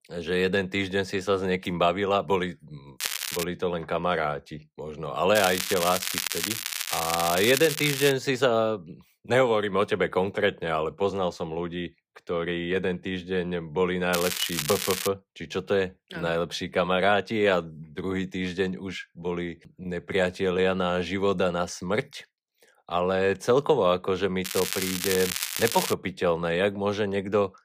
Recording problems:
crackling; loud; 4 times, first at 3 s; 3 dB below the speech

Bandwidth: 15 kHz